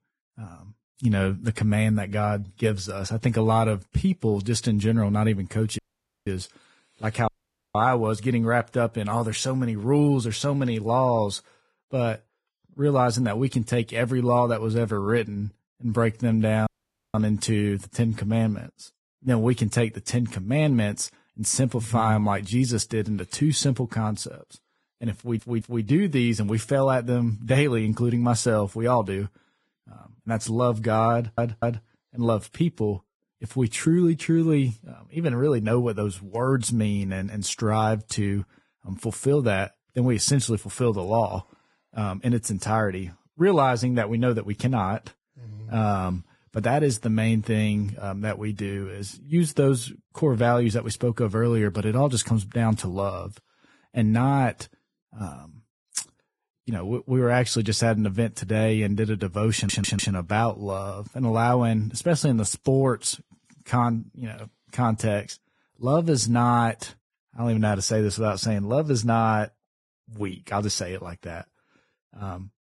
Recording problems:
garbled, watery; badly; nothing above 10.5 kHz
audio cutting out; at 6 s, at 7.5 s and at 17 s
audio stuttering; at 25 s, at 31 s and at 1:00

